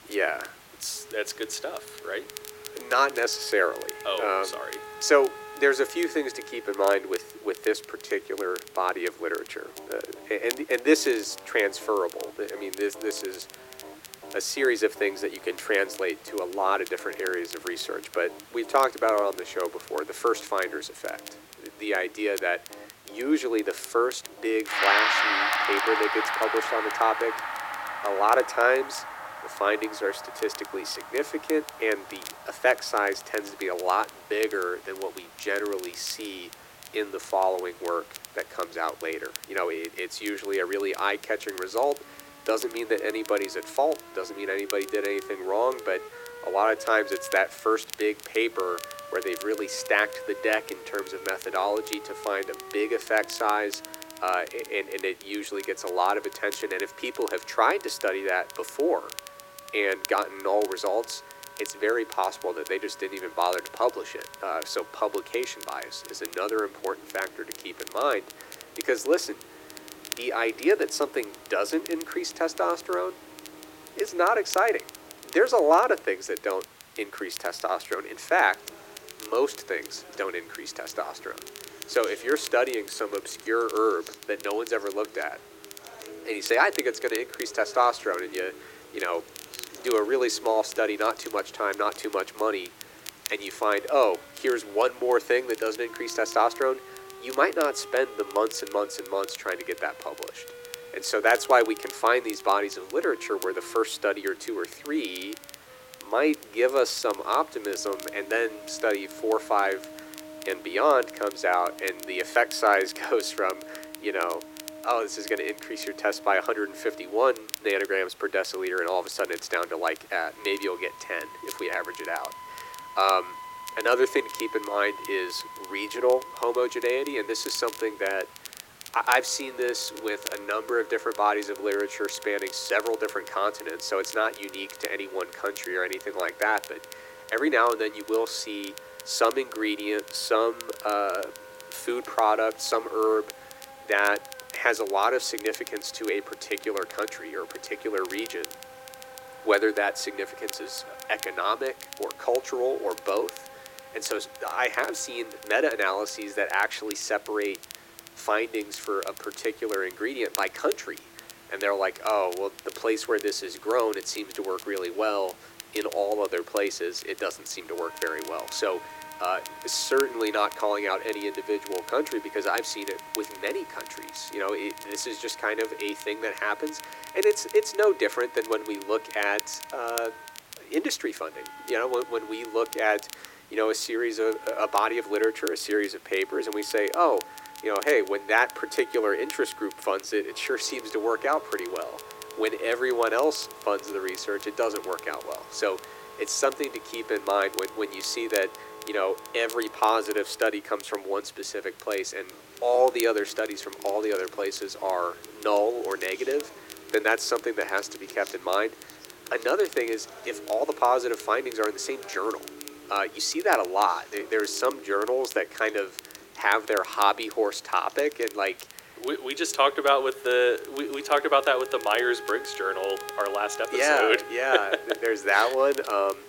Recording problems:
thin; very; fading below 300 Hz
background music; noticeable; throughout; 15 dB below the speech
crackle, like an old record; noticeable; 15 dB below the speech
hiss; faint; throughout; 25 dB below the speech

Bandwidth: 16.5 kHz